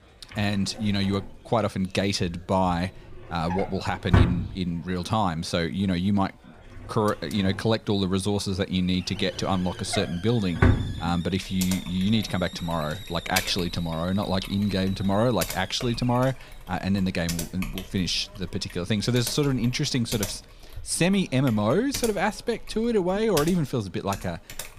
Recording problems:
household noises; loud; throughout; 5 dB below the speech
hiss; noticeable; throughout; 20 dB below the speech
chatter from many people; faint; throughout; 30 dB below the speech

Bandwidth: 15 kHz